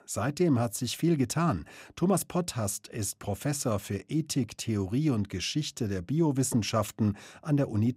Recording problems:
none

